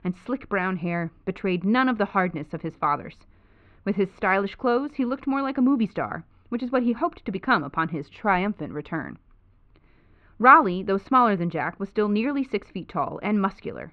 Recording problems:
muffled; very; fading above 3 kHz

